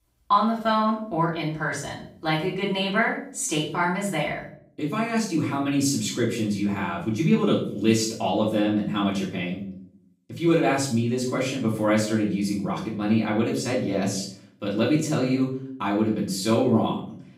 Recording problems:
off-mic speech; far
room echo; noticeable; dies away in 0.5 s

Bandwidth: 15.5 kHz